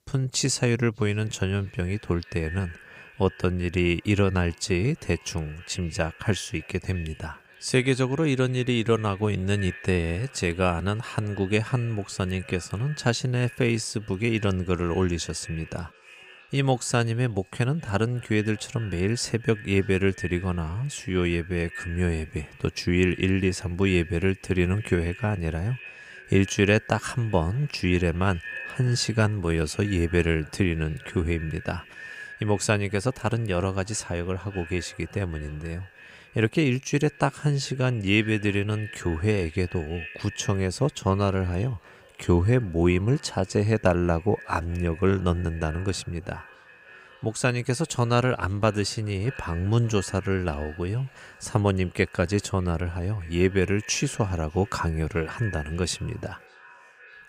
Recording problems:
echo of what is said; faint; throughout; 600 ms later, 20 dB below the speech

